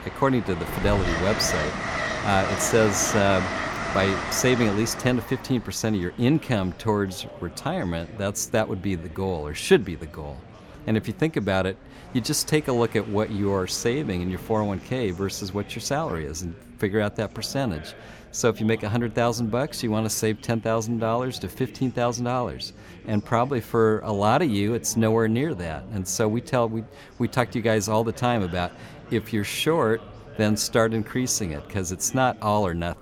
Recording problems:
train or aircraft noise; loud; throughout; 5 dB below the speech
background chatter; noticeable; throughout; 4 voices, 20 dB below the speech

